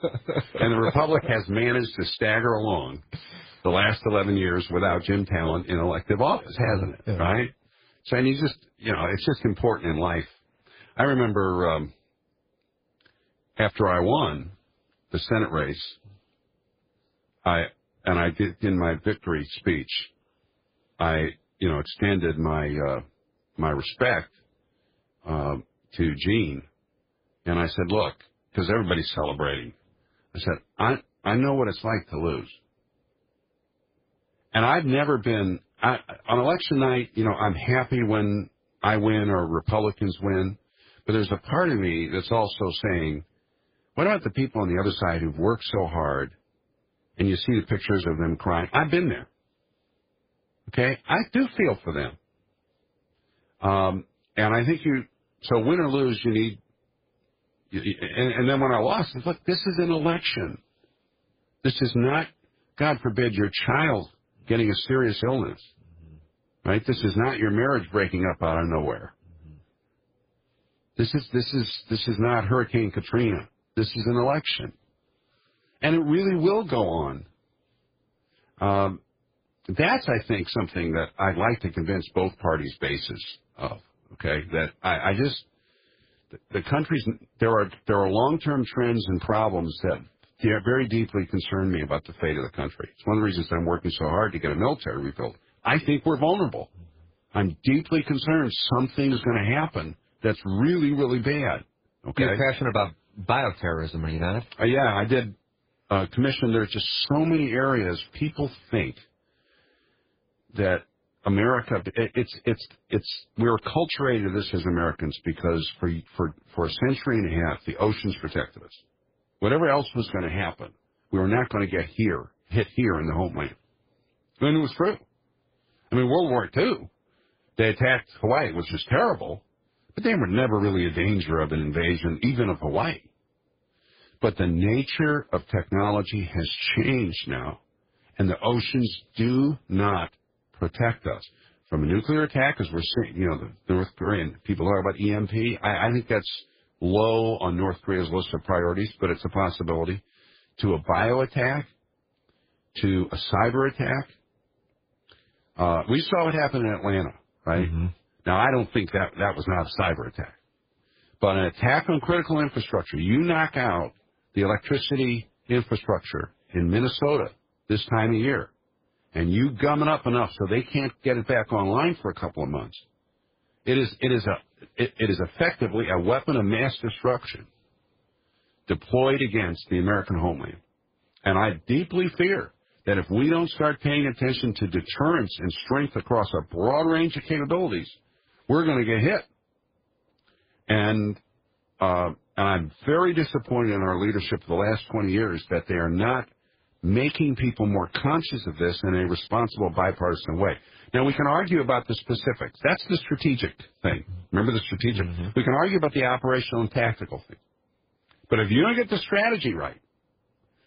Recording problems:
garbled, watery; badly; nothing above 5 kHz

